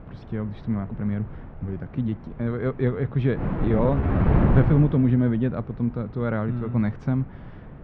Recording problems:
muffled; very; fading above 2 kHz
wind noise on the microphone; heavy; 1 dB below the speech
uneven, jittery; slightly; from 0.5 to 4.5 s

